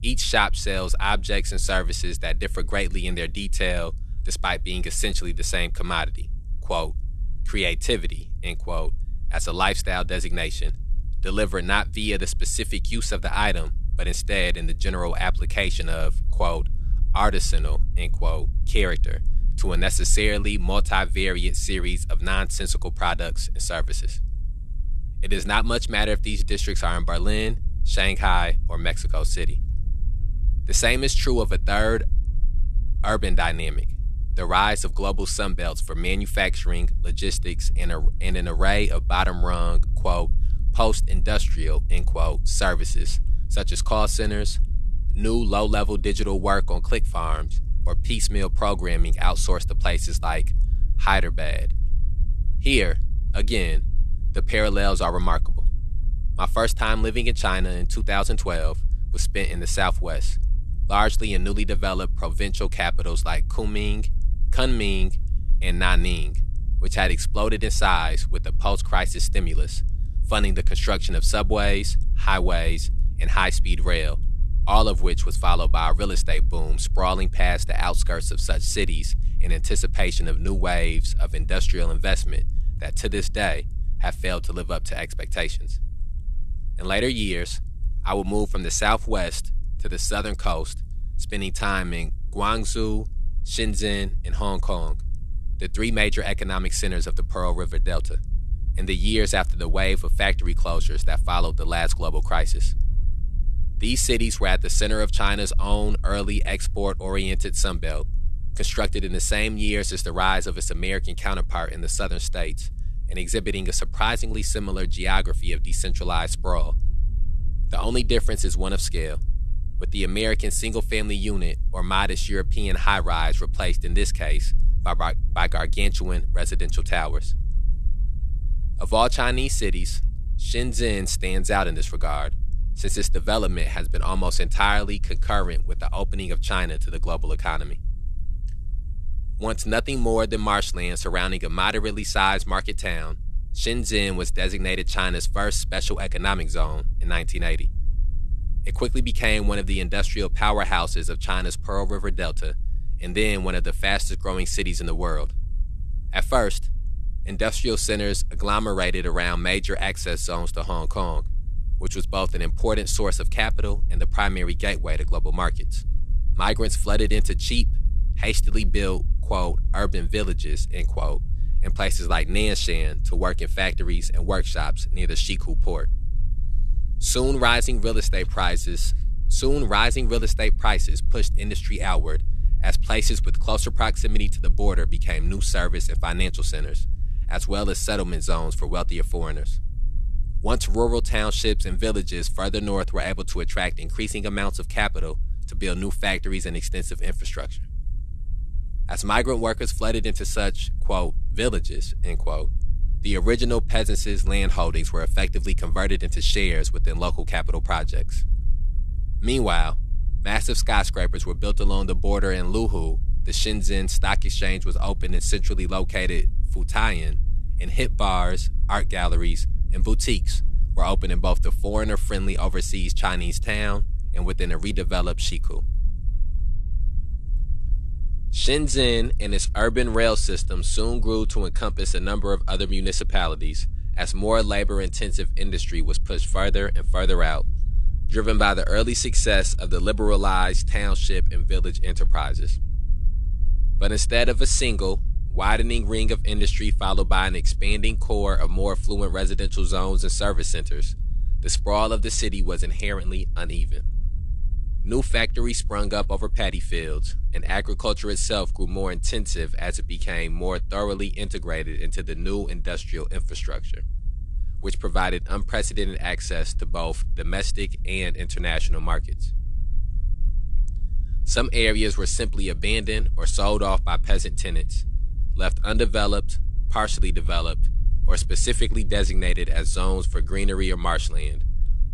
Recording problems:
low rumble; faint; throughout; 25 dB below the speech

